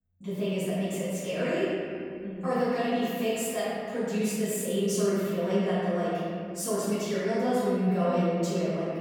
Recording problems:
room echo; strong; dies away in 2.5 s
off-mic speech; far

